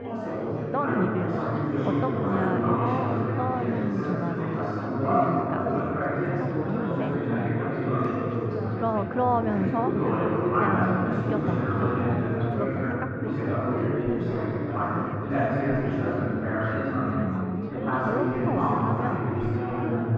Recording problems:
muffled; very; fading above 1.5 kHz
chatter from many people; very loud; throughout; 5 dB above the speech

